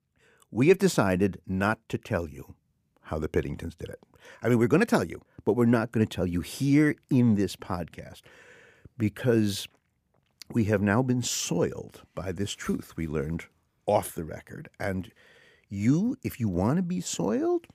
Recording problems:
none

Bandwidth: 15 kHz